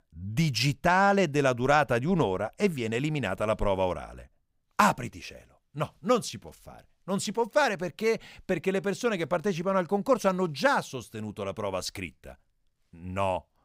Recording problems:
none

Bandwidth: 15.5 kHz